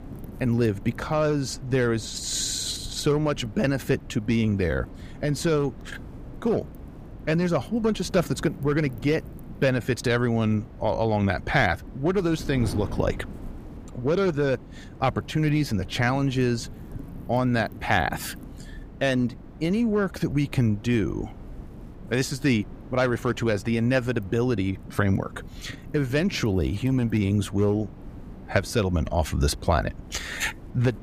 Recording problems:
wind noise on the microphone; occasional gusts; 20 dB below the speech

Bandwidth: 15 kHz